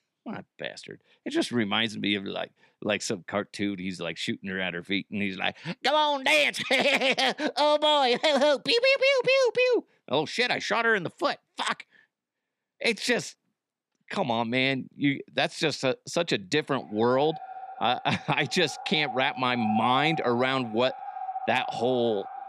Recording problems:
echo of what is said; strong; from 17 s on; 500 ms later, 10 dB below the speech

